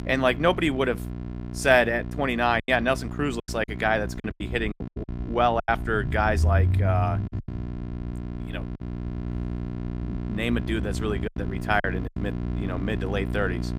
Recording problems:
electrical hum; noticeable; throughout; 60 Hz, 15 dB below the speech
low rumble; faint; throughout; 20 dB below the speech
choppy; very; from 2.5 to 5.5 s and at 11 s; 15% of the speech affected

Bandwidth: 15.5 kHz